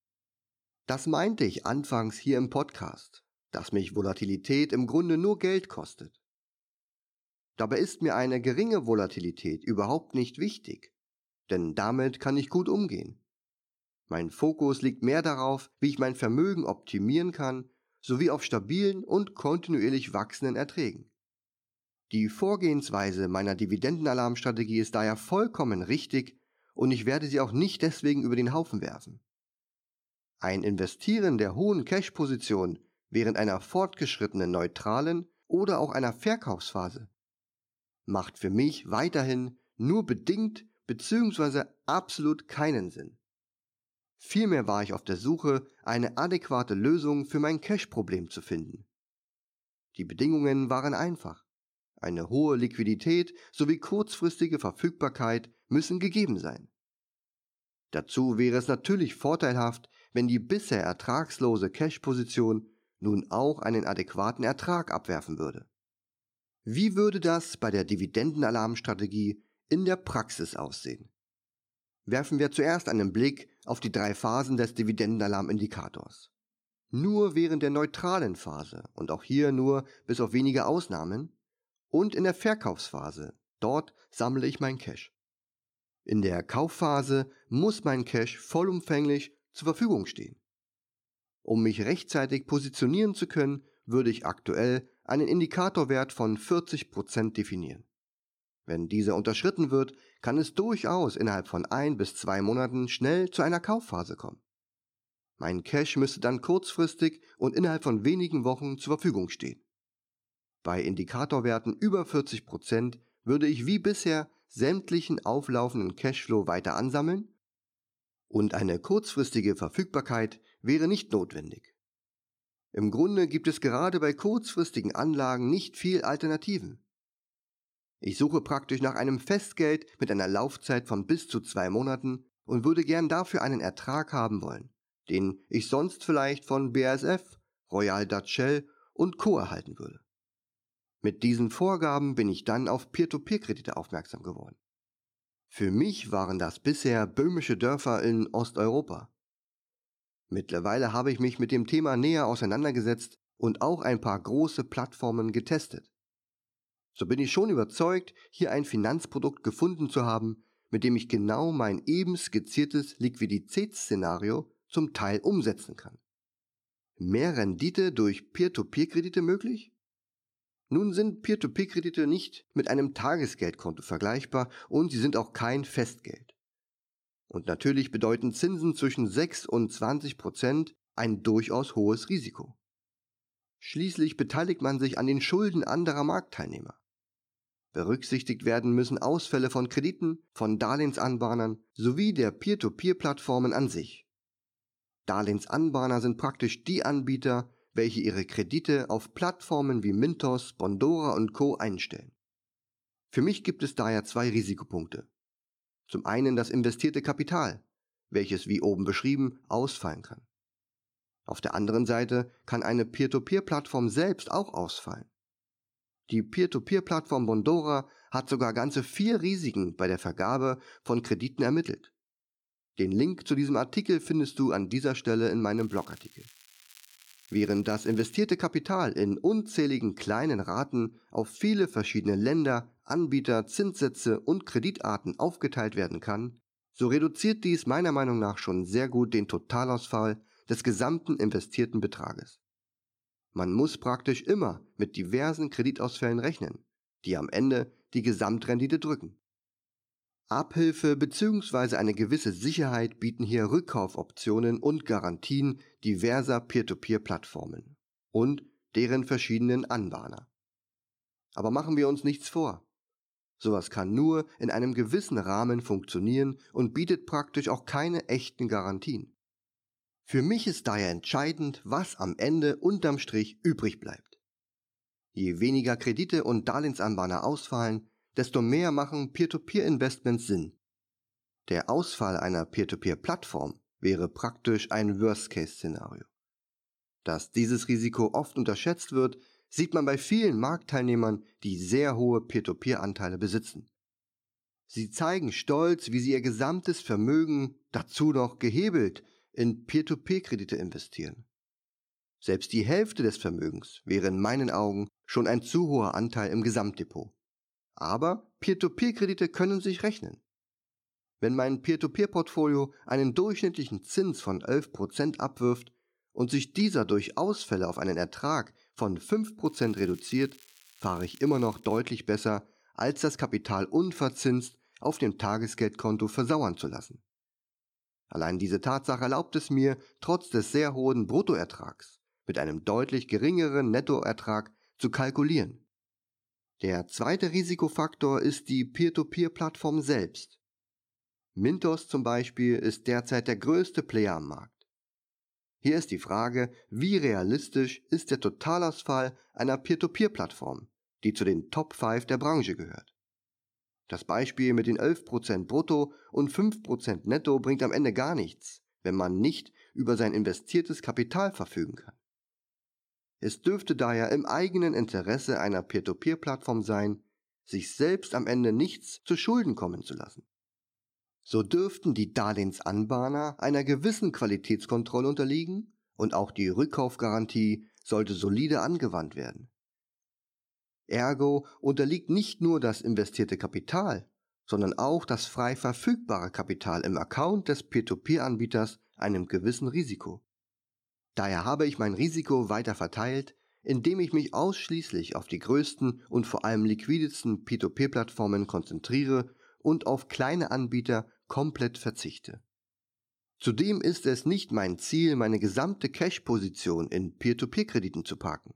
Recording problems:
crackling; faint; from 3:46 to 3:48 and from 5:19 to 5:22; 25 dB below the speech

